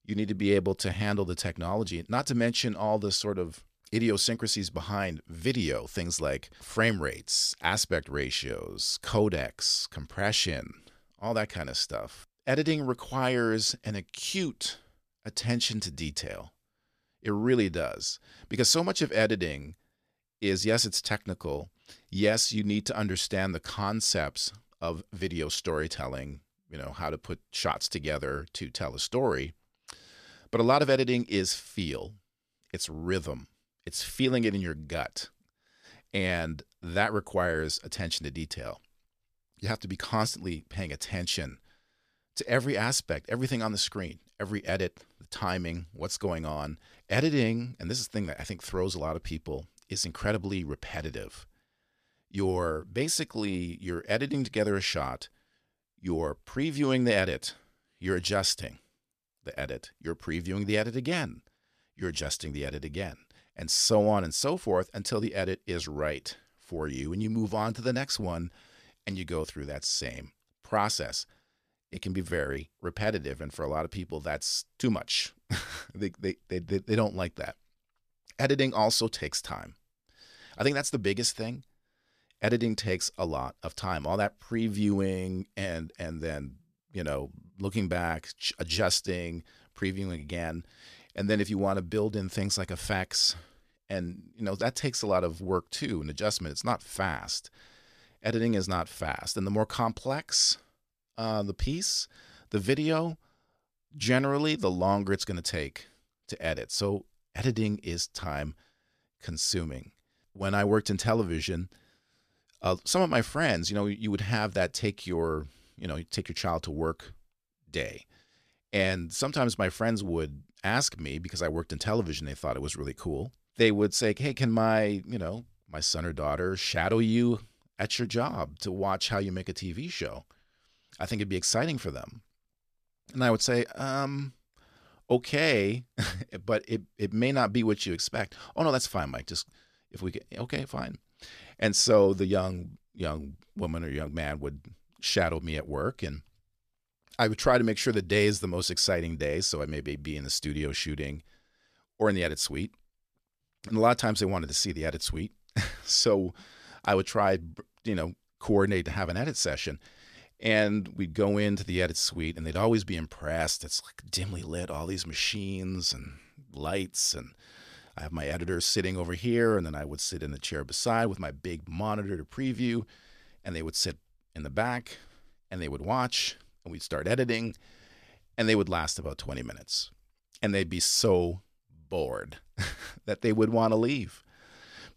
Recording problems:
none

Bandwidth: 14.5 kHz